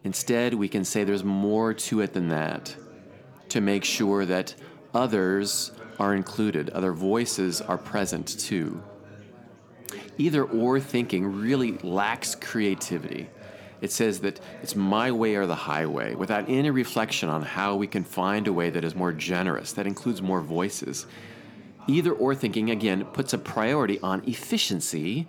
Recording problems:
chatter from many people; noticeable; throughout; 20 dB below the speech

